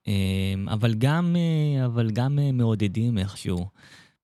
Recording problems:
none

